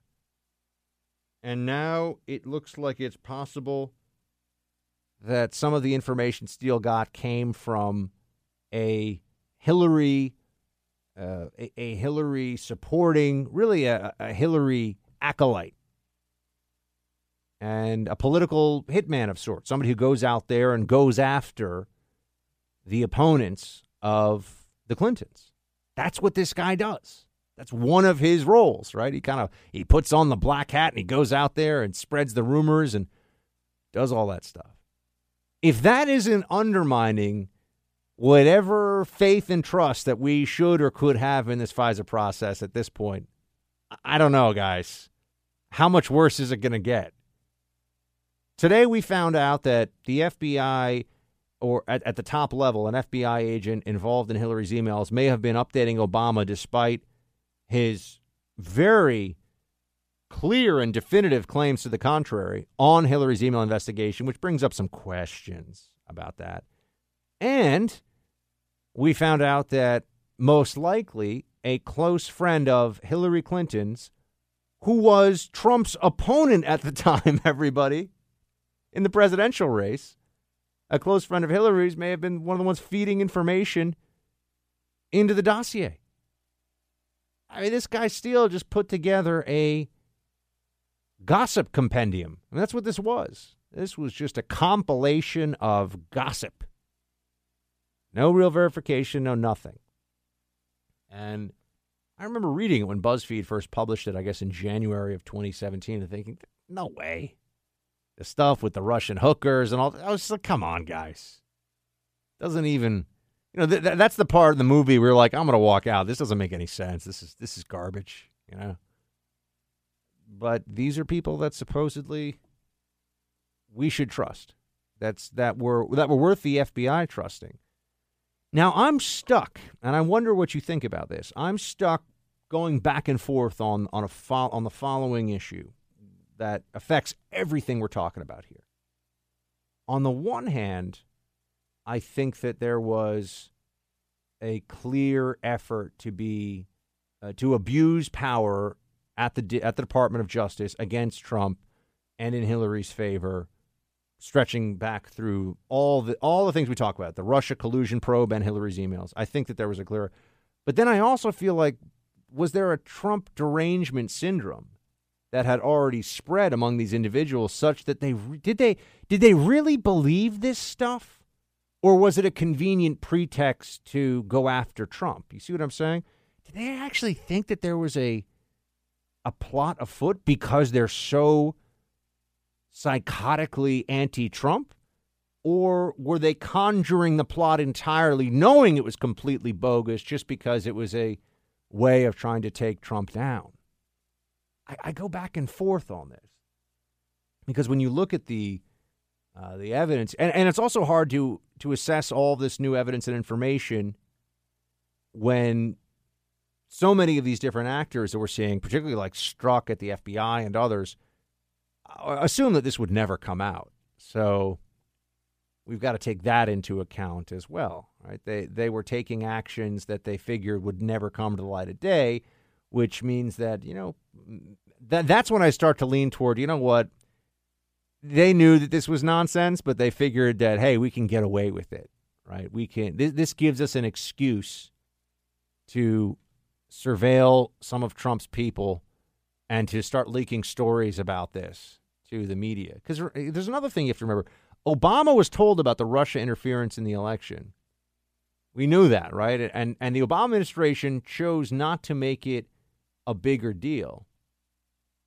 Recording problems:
none

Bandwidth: 15 kHz